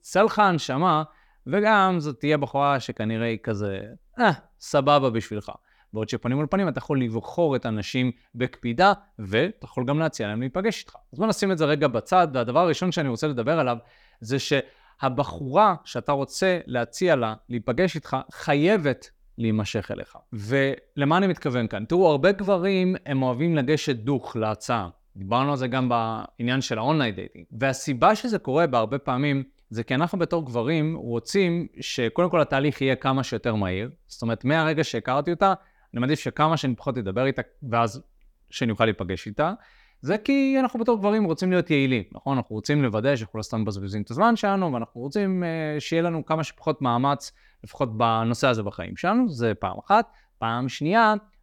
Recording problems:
none

